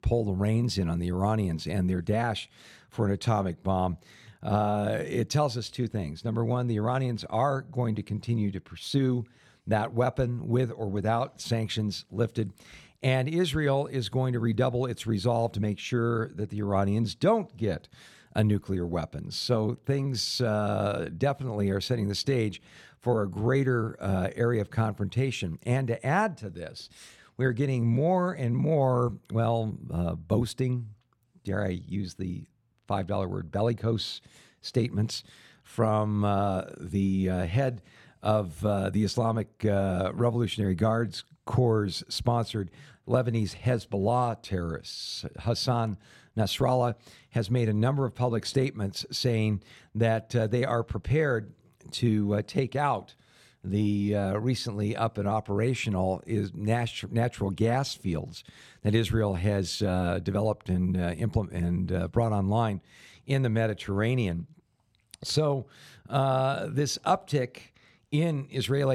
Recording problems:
abrupt cut into speech; at the end

